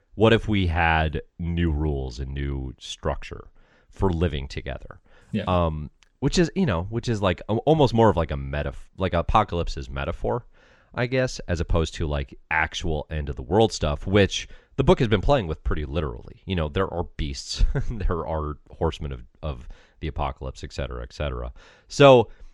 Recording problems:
none

